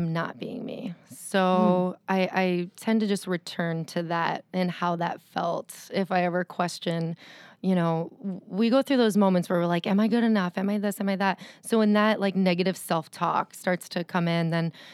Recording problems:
abrupt cut into speech; at the start

